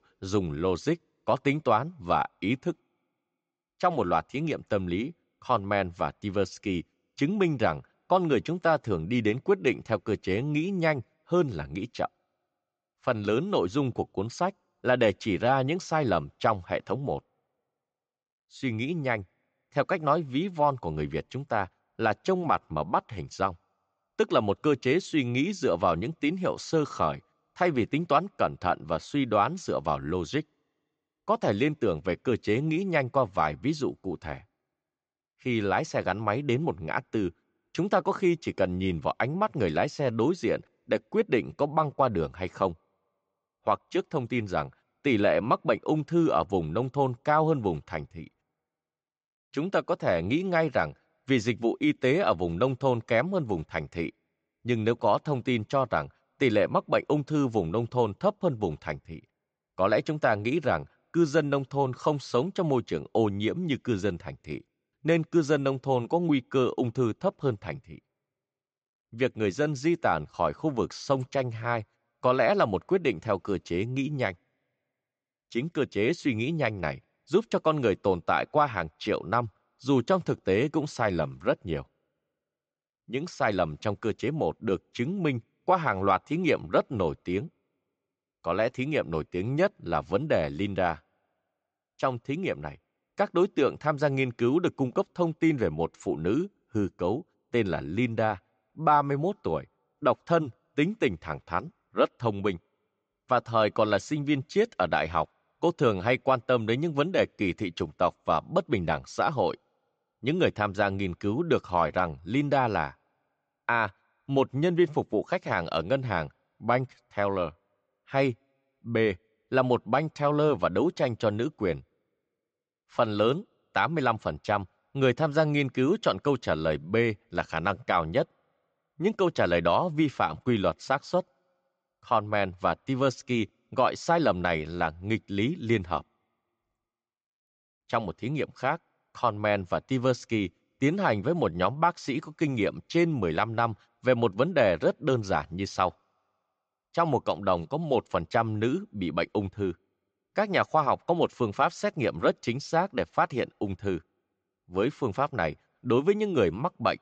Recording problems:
high frequencies cut off; noticeable; nothing above 8 kHz

